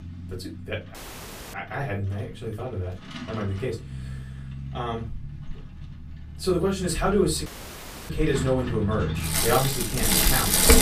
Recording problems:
off-mic speech; far
room echo; very slight; dies away in 0.2 s
traffic noise; very loud; throughout; 1 dB above the speech
audio cutting out; at 1 s for 0.5 s and at 7.5 s for 0.5 s

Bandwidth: 15 kHz